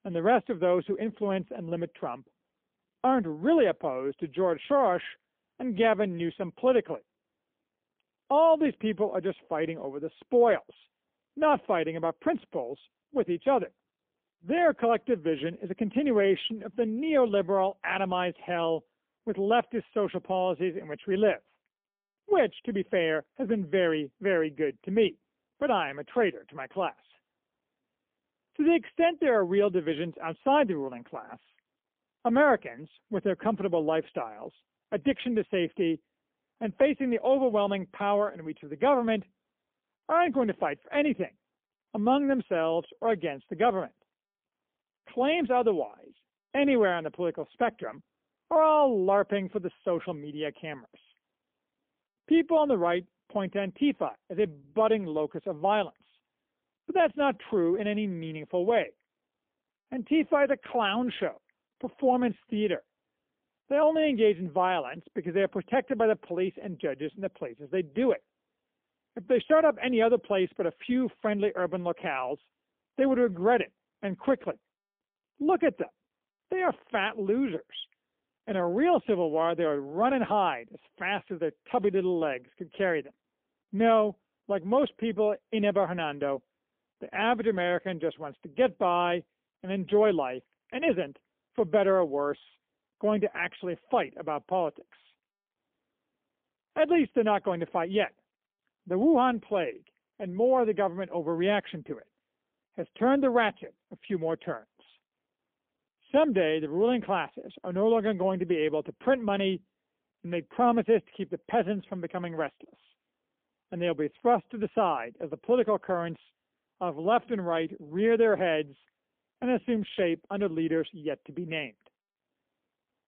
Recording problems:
phone-call audio; poor line; nothing above 3.5 kHz

